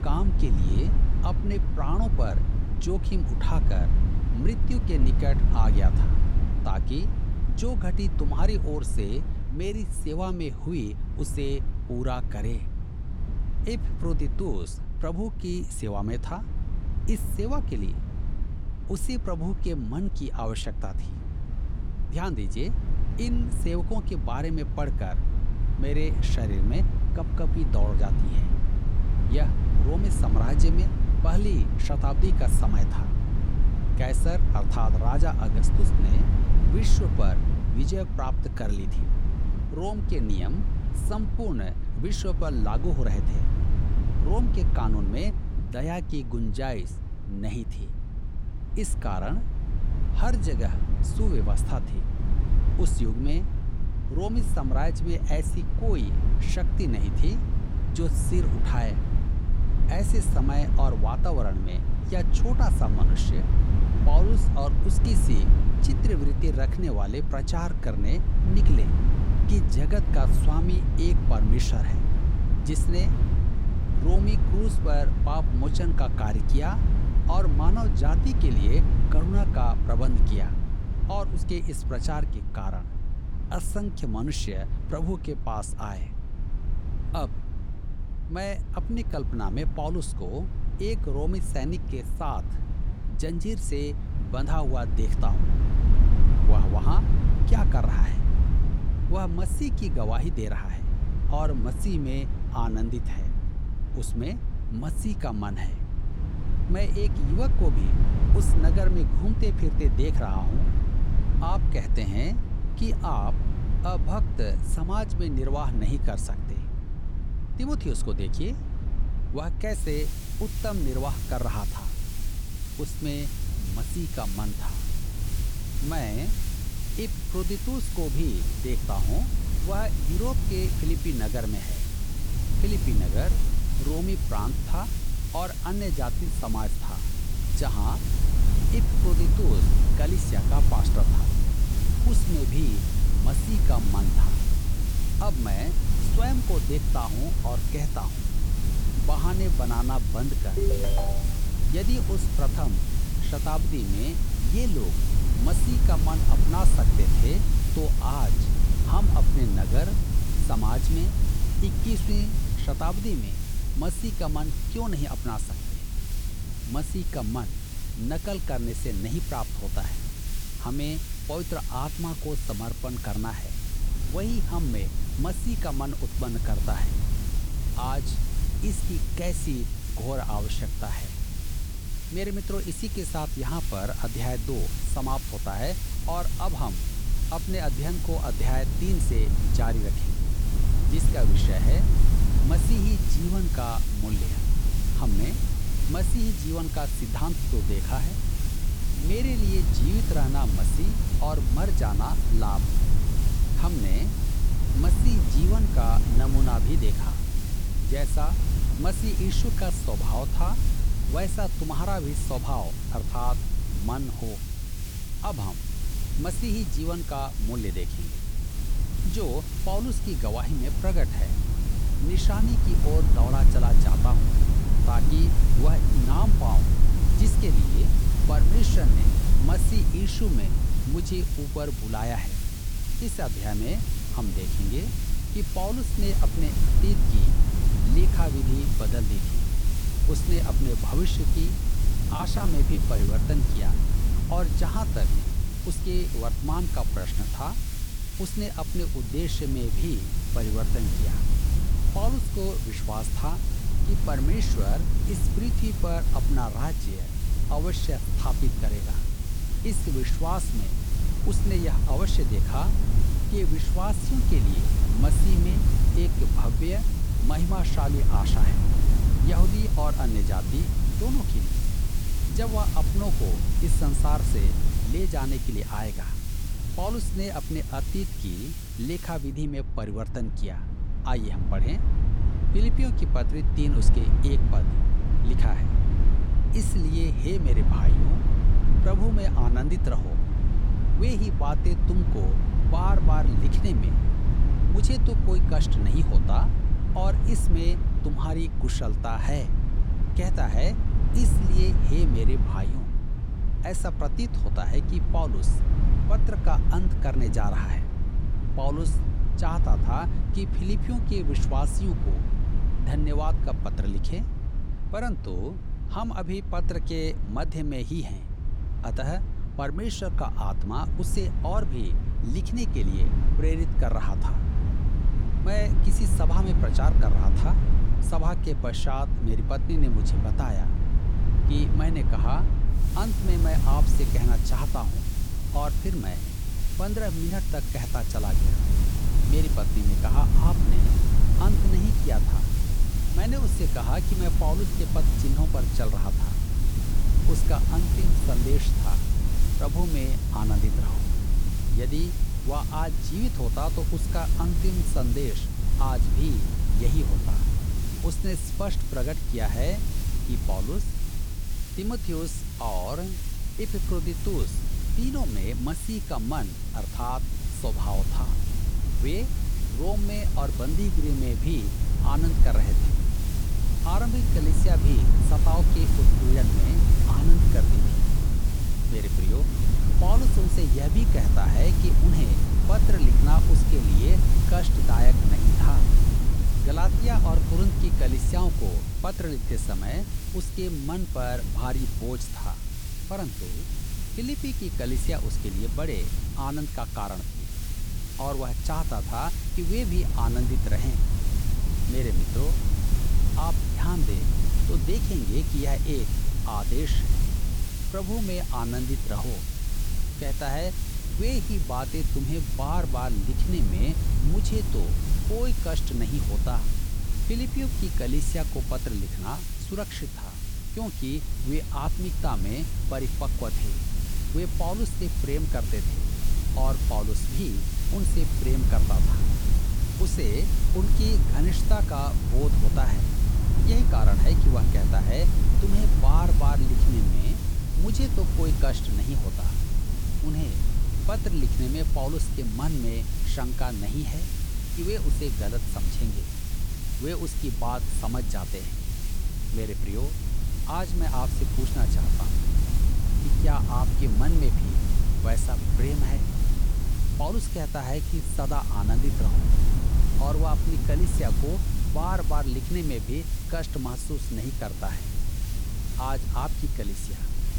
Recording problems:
hiss; loud; from 2:00 to 4:39 and from 5:33 on; 7 dB below the speech
low rumble; loud; throughout; 6 dB below the speech
phone ringing; loud; at 2:31; peak 2 dB above the speech
choppy; very; at 4:02; 14% of the speech affected

